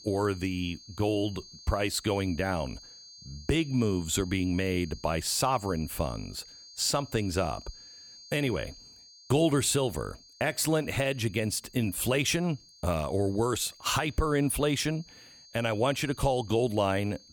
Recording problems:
high-pitched whine; noticeable; throughout; 4.5 kHz, 20 dB below the speech

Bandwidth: 18.5 kHz